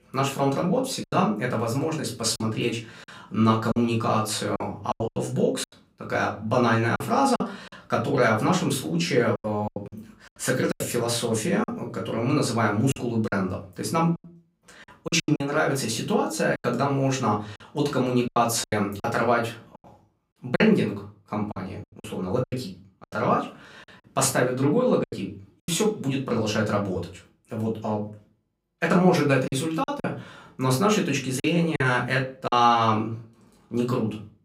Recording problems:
off-mic speech; far
room echo; very slight; dies away in 0.3 s
choppy; very; 8% of the speech affected

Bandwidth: 15.5 kHz